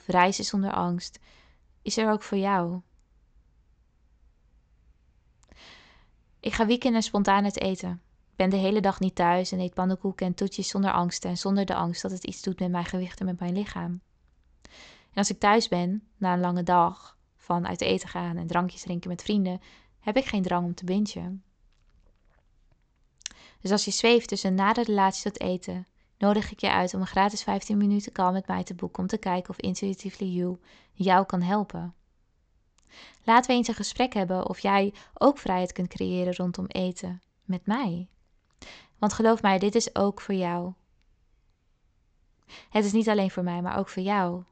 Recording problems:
high frequencies cut off; noticeable; nothing above 8 kHz

